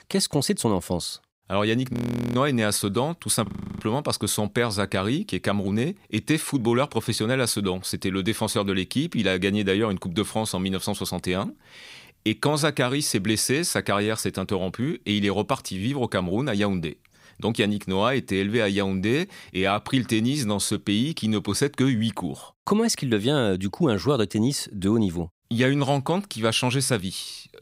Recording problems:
audio freezing; at 2 s and at 3.5 s

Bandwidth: 15.5 kHz